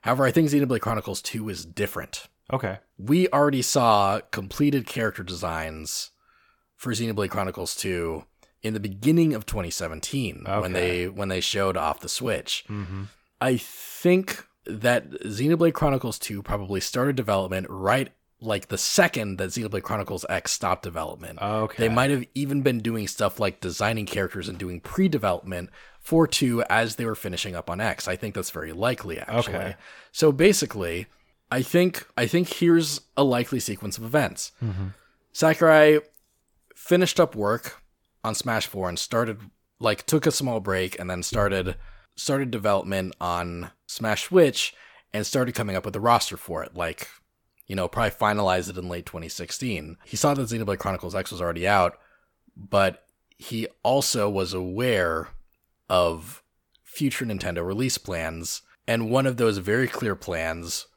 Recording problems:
none

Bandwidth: 18 kHz